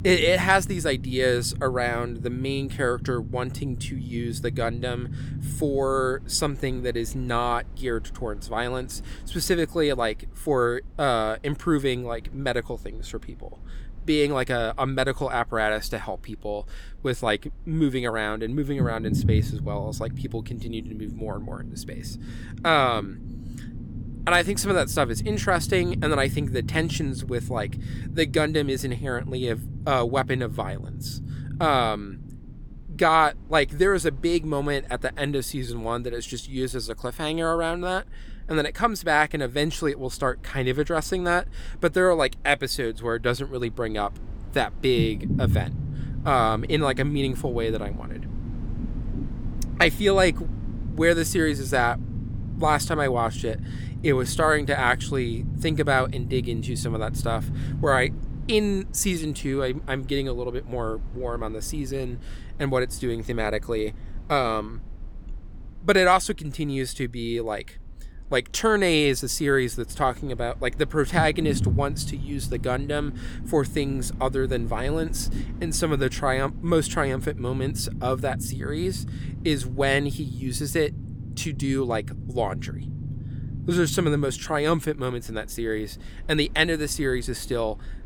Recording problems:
low rumble; noticeable; throughout; 20 dB below the speech

